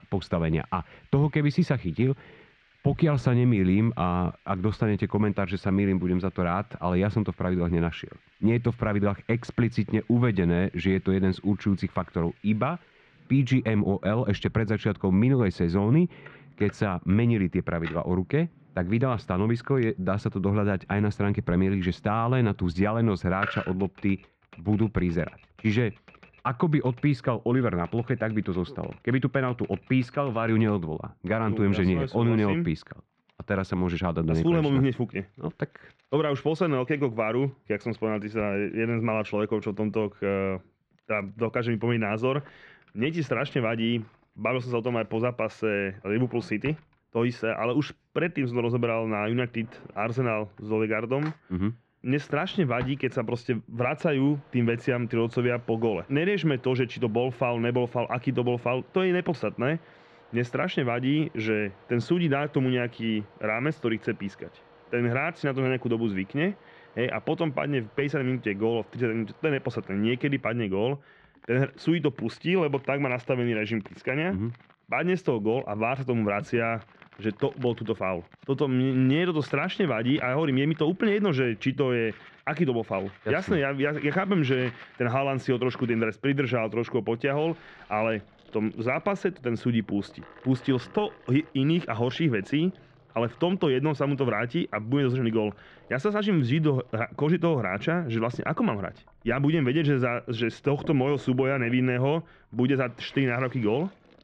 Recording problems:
muffled; very; fading above 2 kHz
household noises; faint; throughout; 25 dB below the speech

